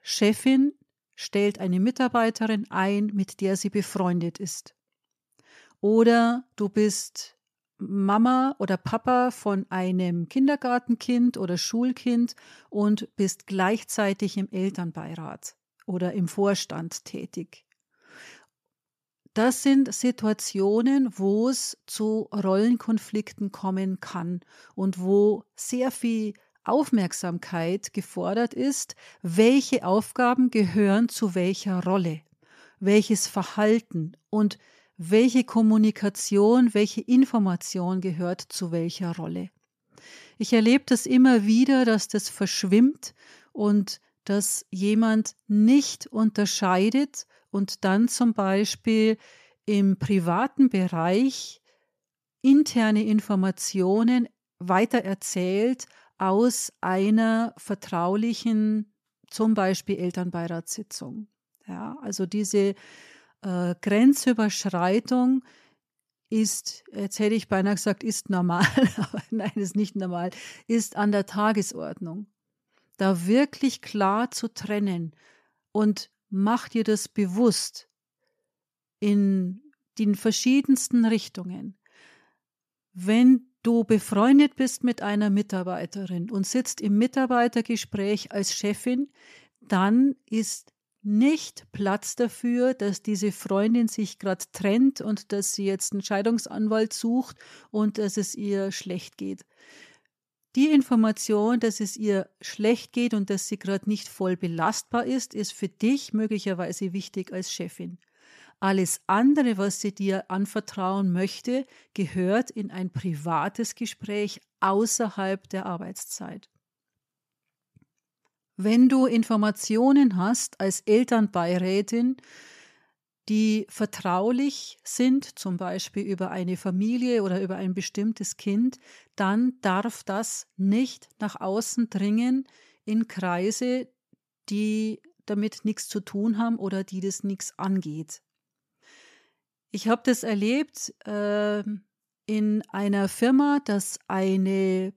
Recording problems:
none

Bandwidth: 14.5 kHz